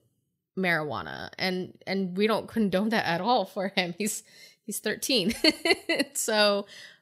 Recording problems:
none

